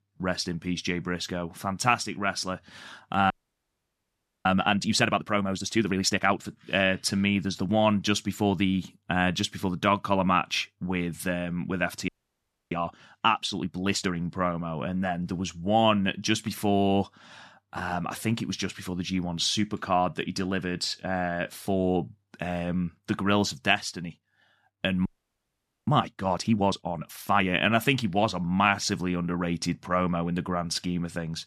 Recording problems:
audio freezing; at 3.5 s for 1 s, at 12 s for 0.5 s and at 25 s for 1 s

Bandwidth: 13.5 kHz